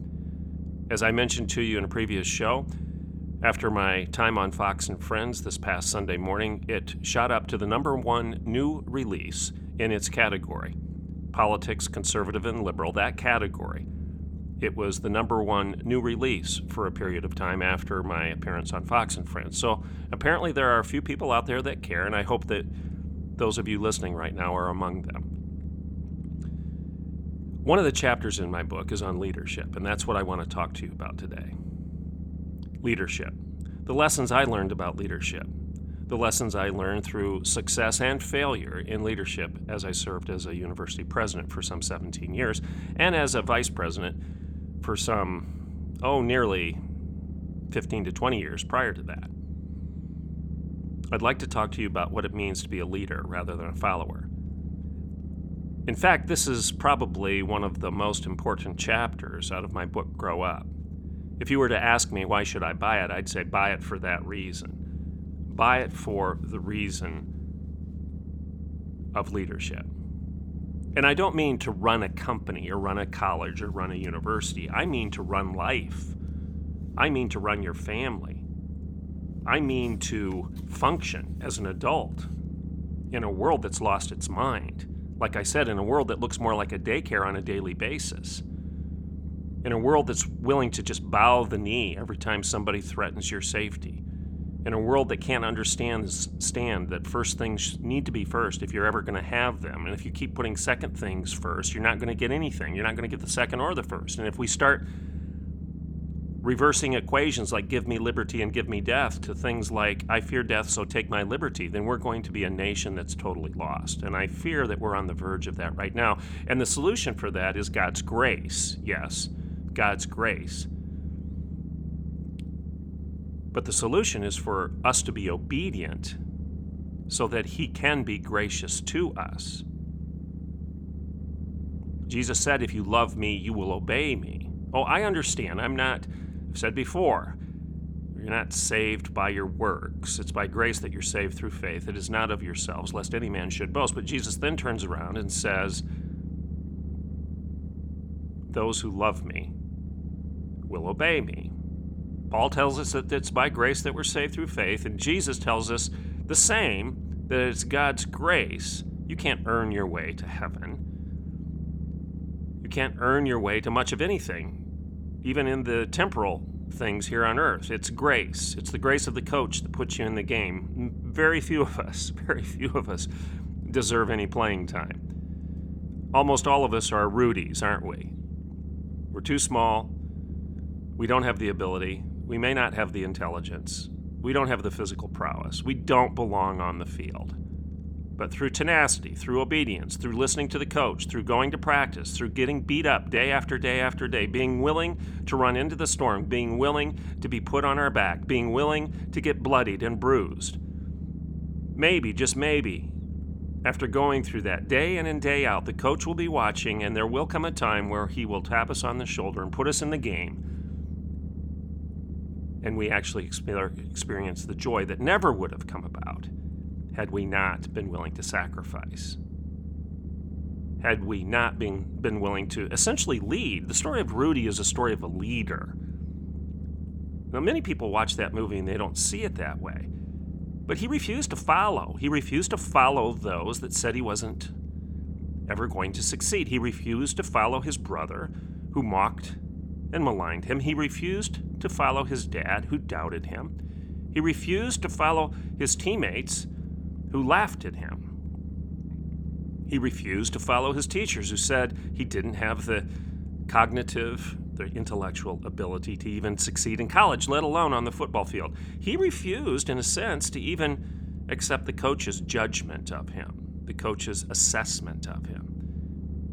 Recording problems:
low rumble; faint; throughout; 20 dB below the speech

